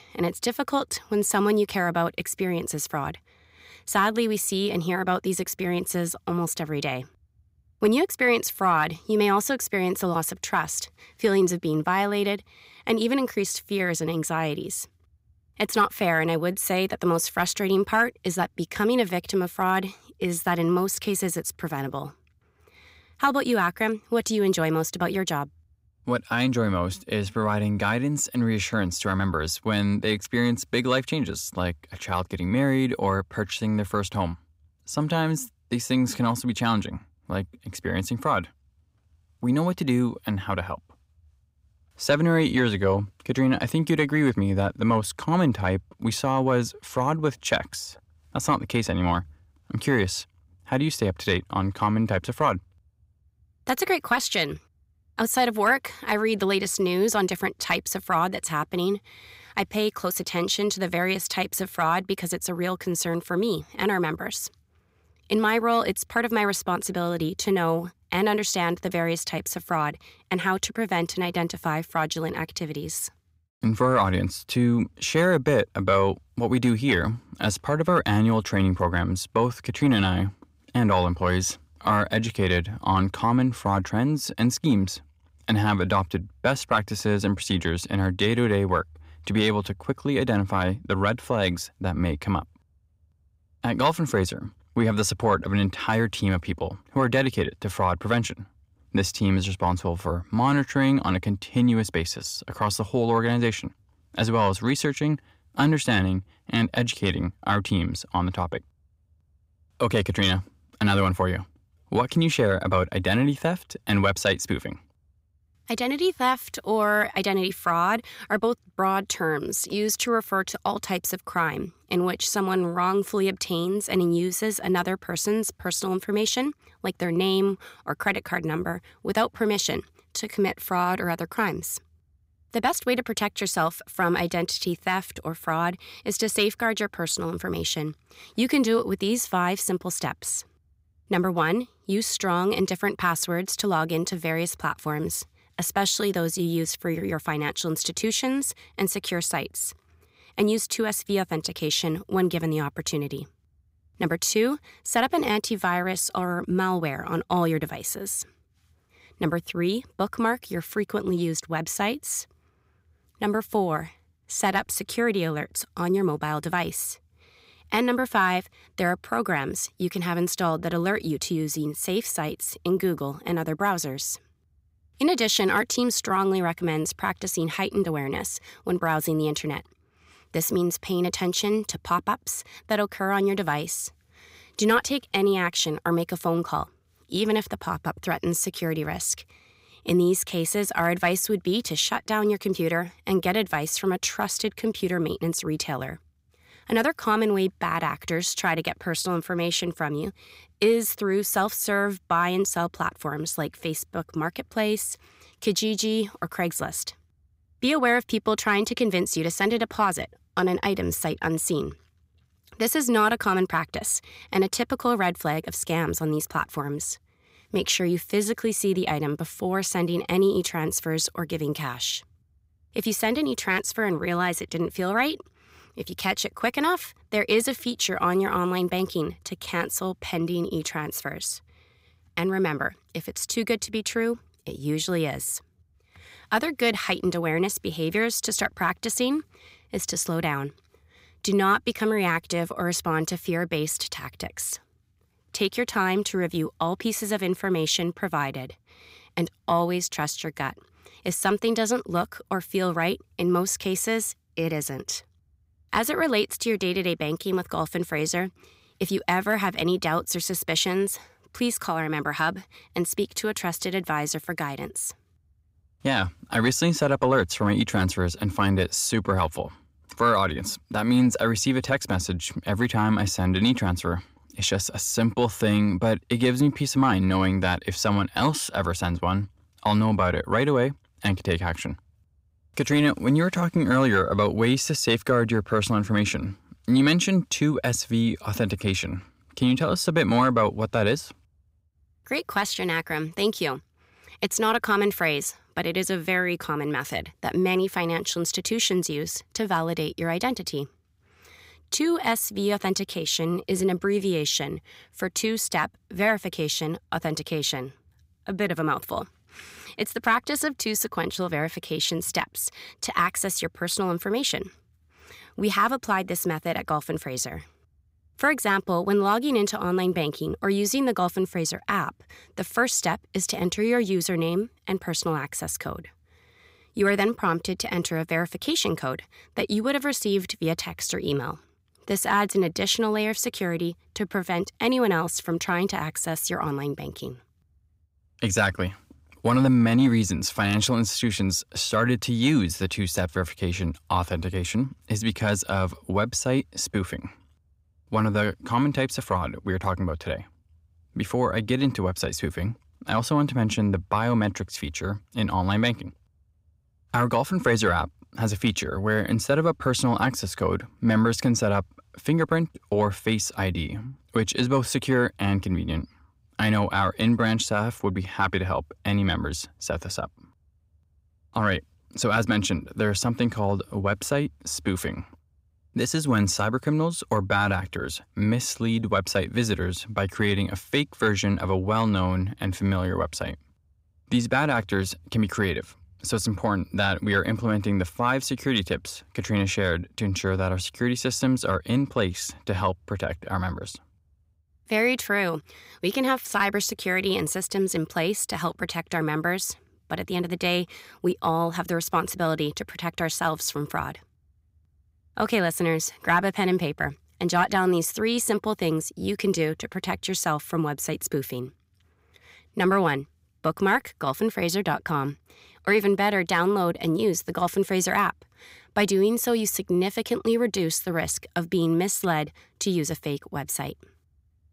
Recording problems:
none

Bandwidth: 15.5 kHz